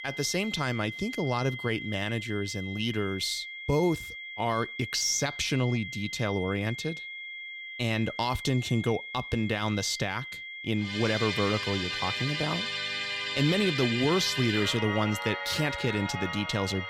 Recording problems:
high-pitched whine; loud; throughout; 2 kHz, 8 dB below the speech
background music; loud; from 11 s on; 3 dB below the speech

